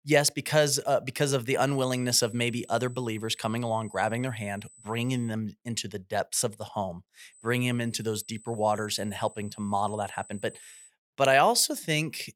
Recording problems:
high-pitched whine; faint; from 1.5 to 5.5 s and from 7.5 to 11 s; 8 kHz, 20 dB below the speech

